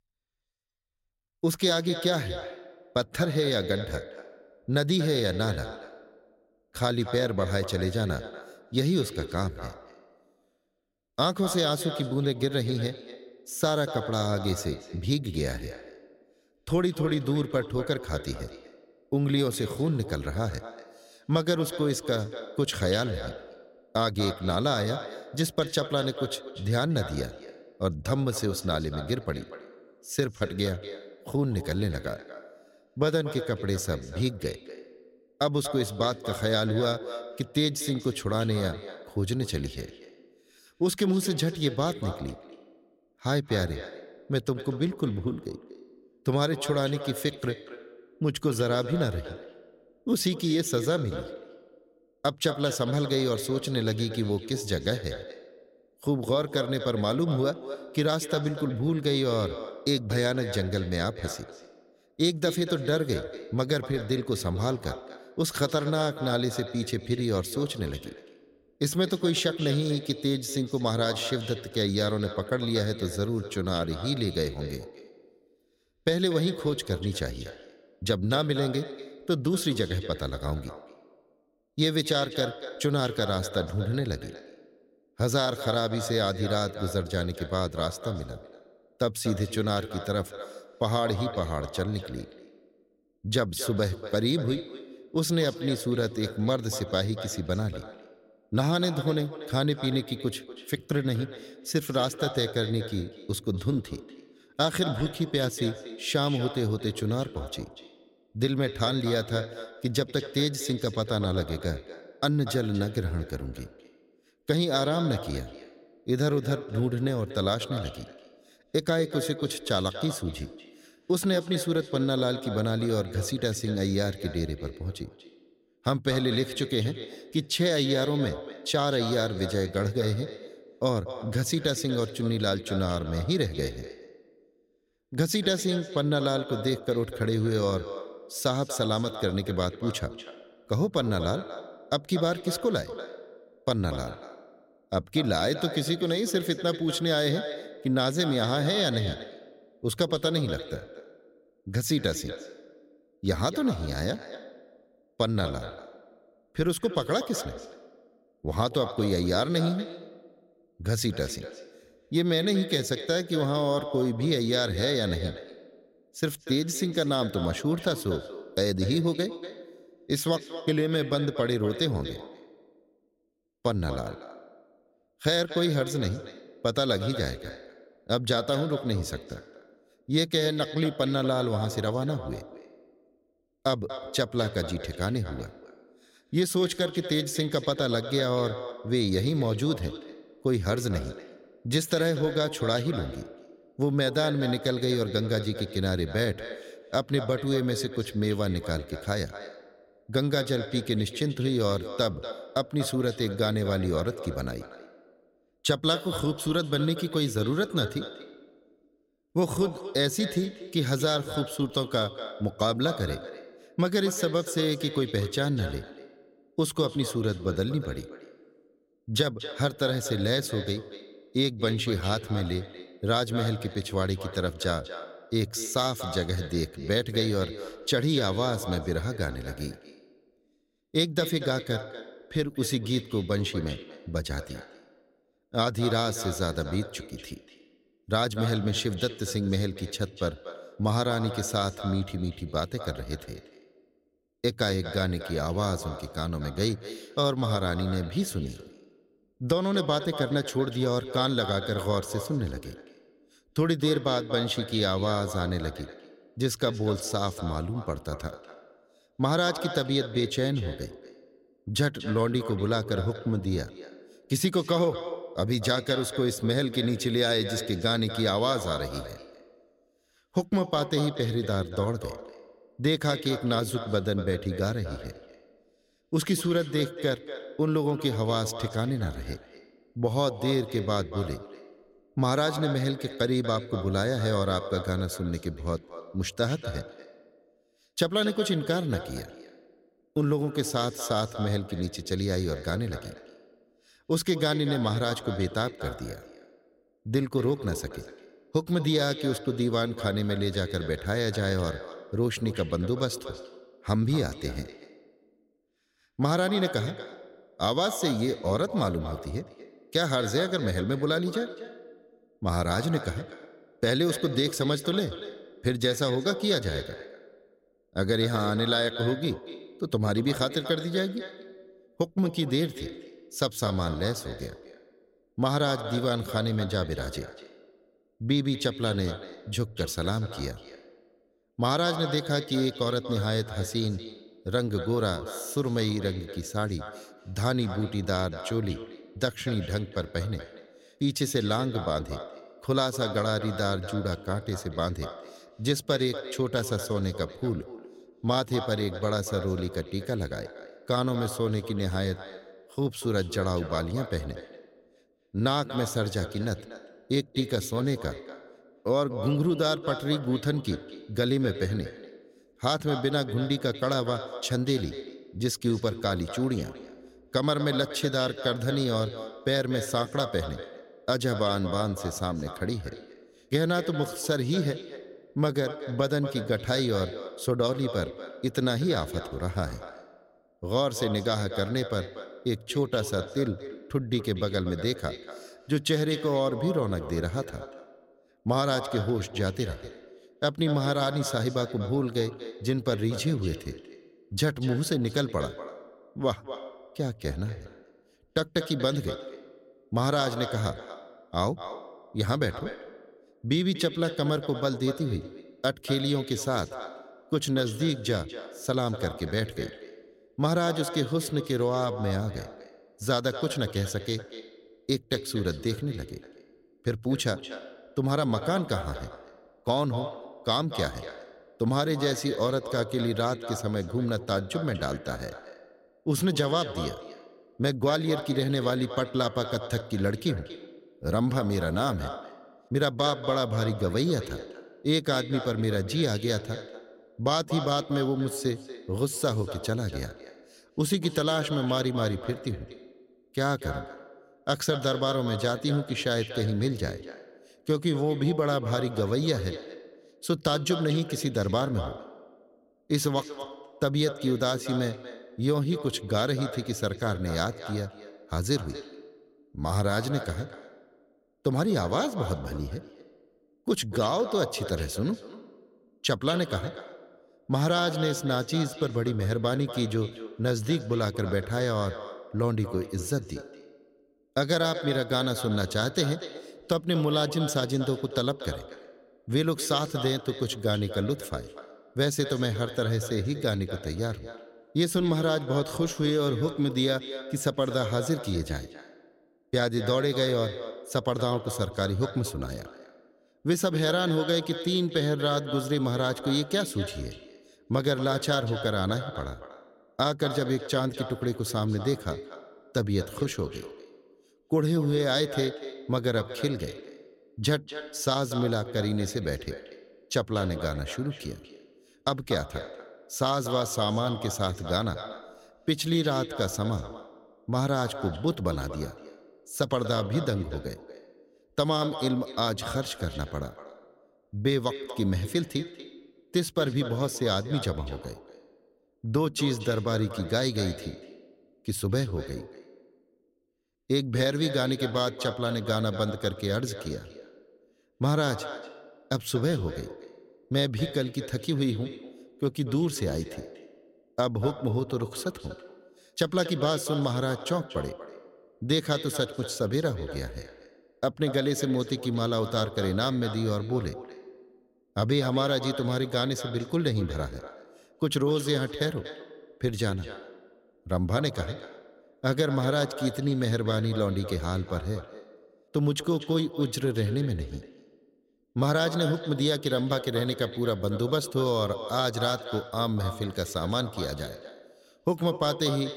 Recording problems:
echo of what is said; strong; throughout; 240 ms later, 10 dB below the speech

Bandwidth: 16 kHz